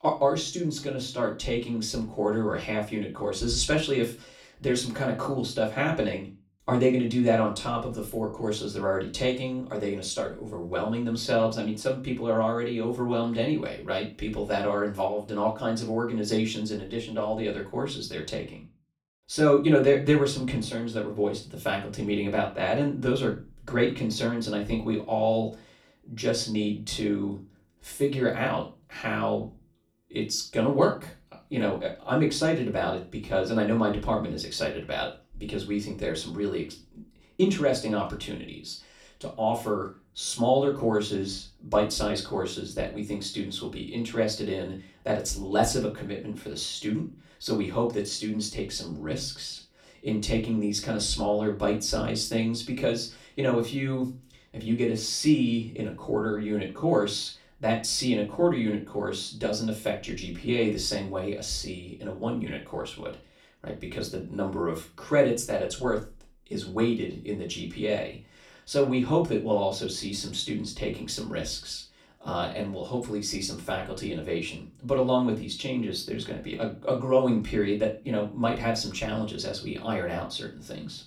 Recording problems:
off-mic speech; far
room echo; very slight; dies away in 0.3 s

